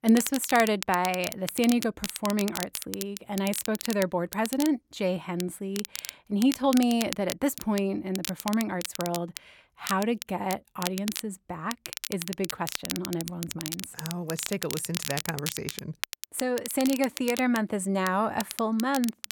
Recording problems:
crackle, like an old record; loud; 8 dB below the speech

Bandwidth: 17 kHz